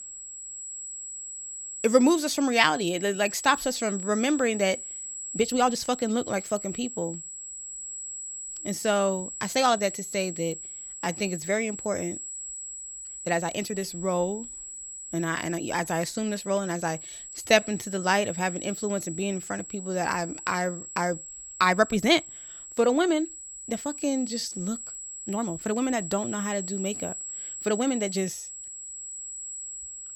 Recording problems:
high-pitched whine; loud; throughout; 7.5 kHz, 9 dB below the speech
uneven, jittery; strongly; from 5 to 28 s

